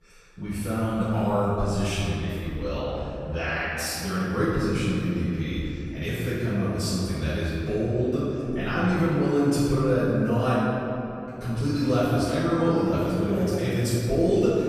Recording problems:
room echo; strong; dies away in 2.8 s
off-mic speech; far

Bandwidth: 14.5 kHz